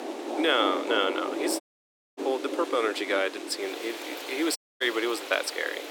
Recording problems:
thin; very; fading below 300 Hz
rain or running water; loud; throughout; 6 dB below the speech
murmuring crowd; faint; throughout; 25 dB below the speech
audio cutting out; at 1.5 s for 0.5 s and at 4.5 s

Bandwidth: 17.5 kHz